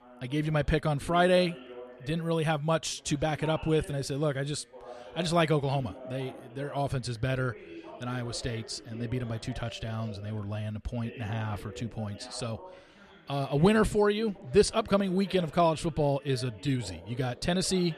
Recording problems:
background chatter; noticeable; throughout; 2 voices, 20 dB below the speech

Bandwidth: 13.5 kHz